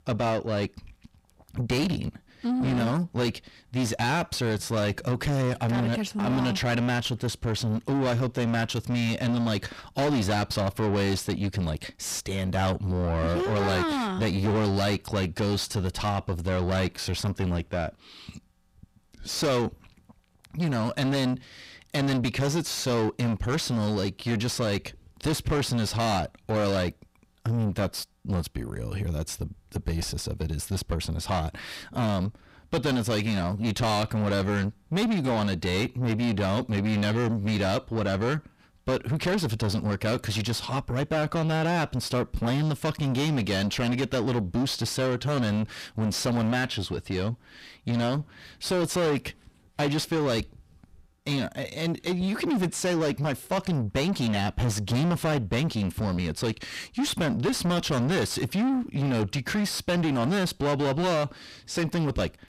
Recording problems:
distortion; heavy; 6 dB below the speech

